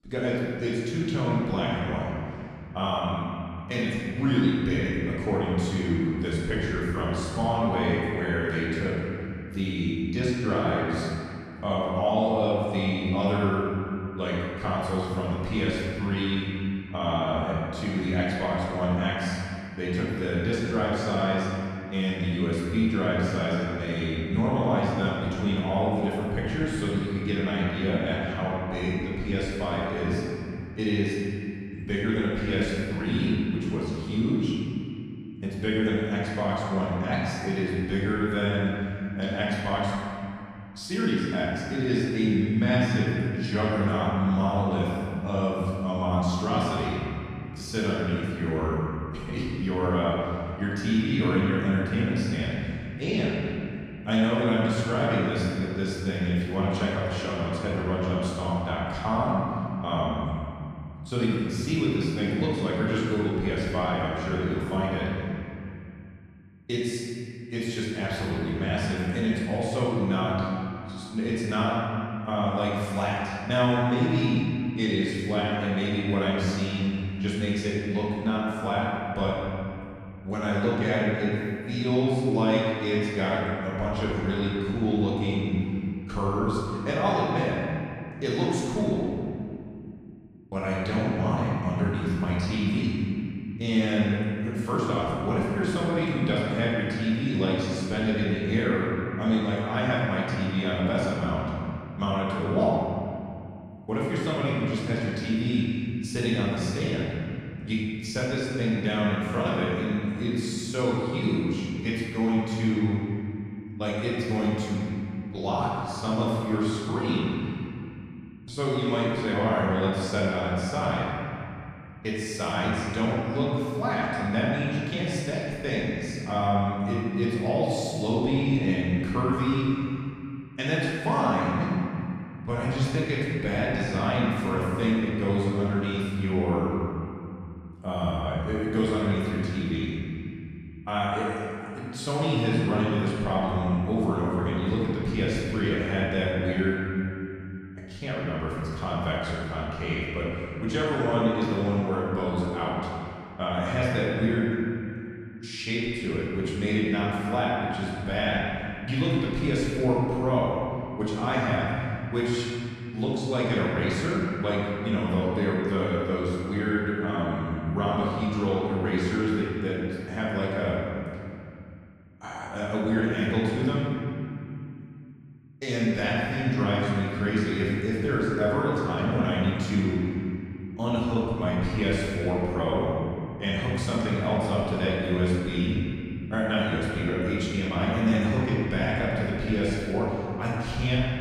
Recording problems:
room echo; strong; dies away in 2.7 s
off-mic speech; far

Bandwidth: 14.5 kHz